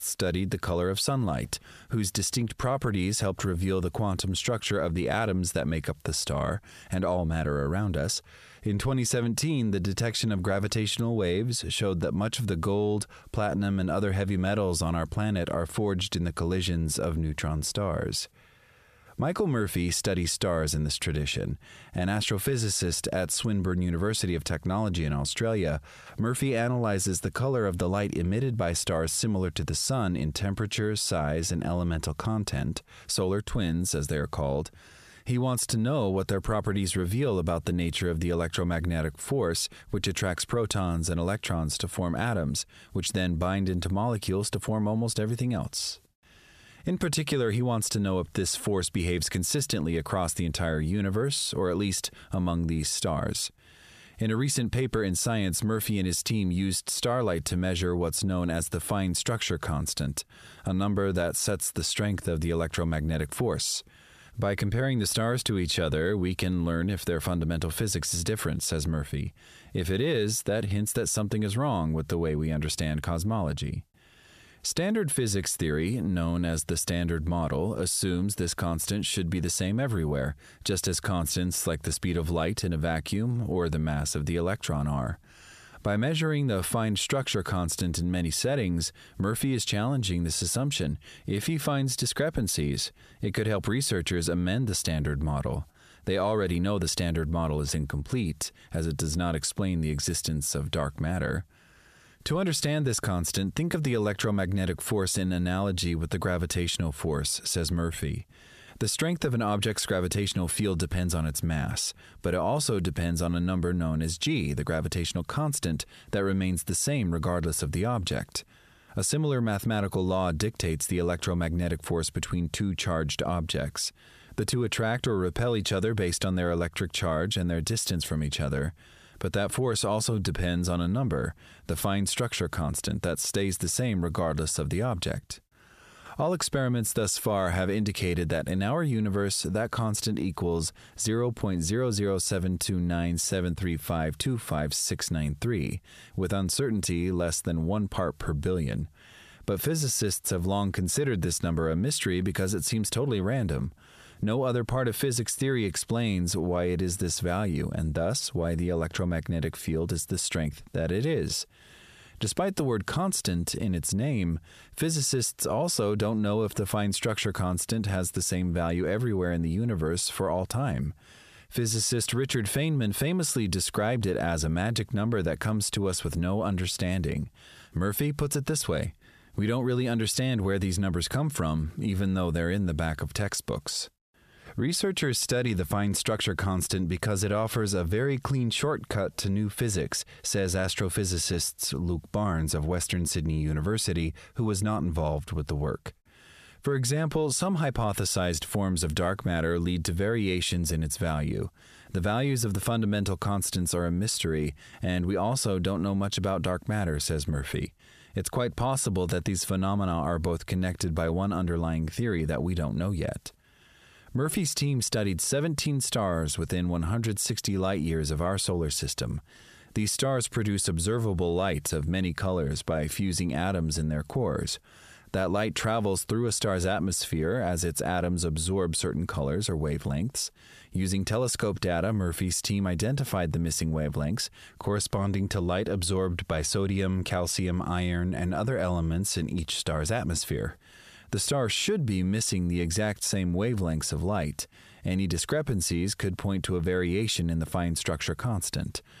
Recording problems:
squashed, flat; heavily

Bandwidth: 14.5 kHz